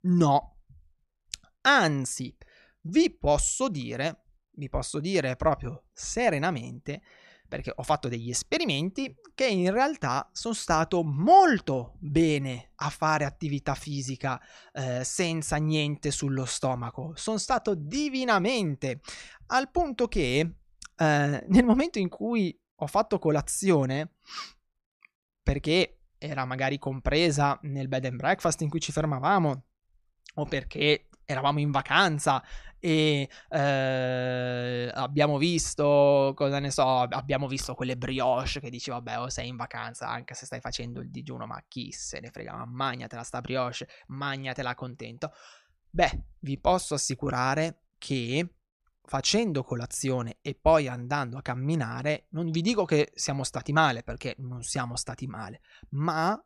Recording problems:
none

